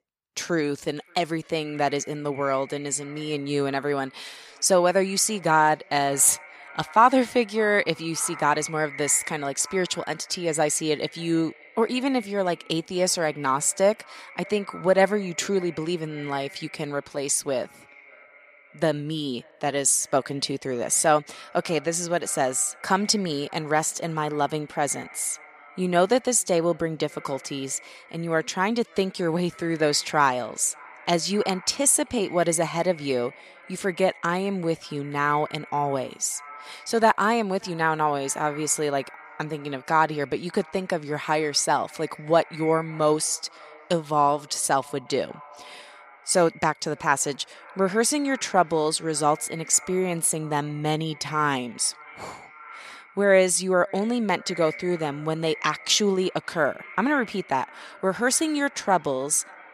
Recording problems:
echo of what is said; faint; throughout; 580 ms later, 20 dB below the speech

